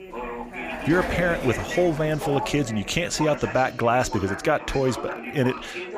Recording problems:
background chatter; loud; throughout; 3 voices, 9 dB below the speech
door banging; faint; until 3 s; peak 10 dB below the speech

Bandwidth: 15 kHz